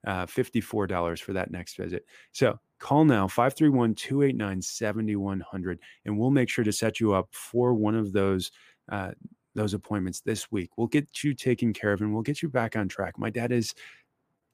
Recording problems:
none

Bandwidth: 15 kHz